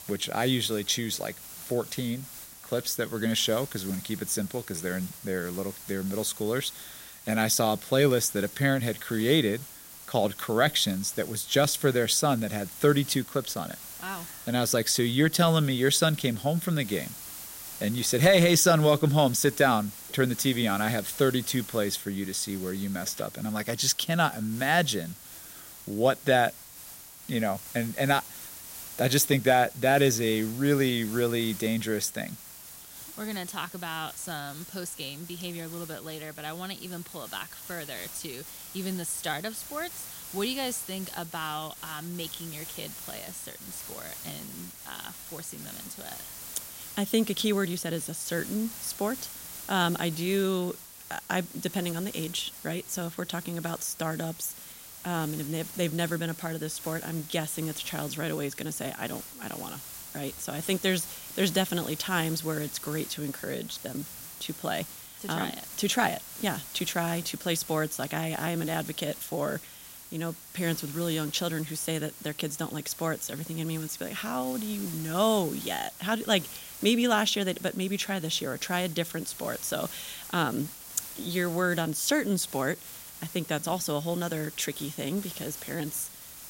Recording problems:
hiss; noticeable; throughout; 10 dB below the speech

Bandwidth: 16 kHz